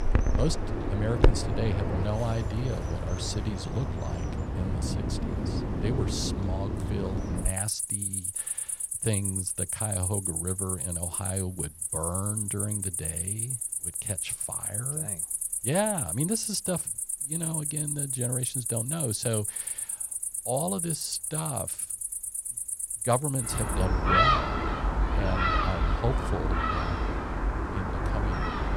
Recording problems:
animal sounds; very loud; throughout; 4 dB above the speech

